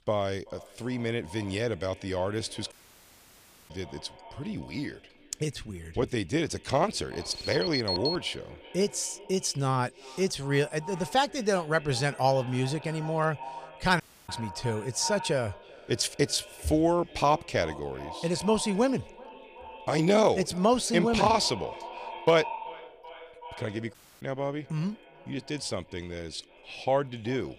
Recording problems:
echo of what is said; noticeable; throughout; 380 ms later, 15 dB below the speech
audio cutting out; at 2.5 s for 1 s, at 14 s and at 24 s
alarm; noticeable; from 7 to 8.5 s; peak 1 dB below the speech

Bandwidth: 15 kHz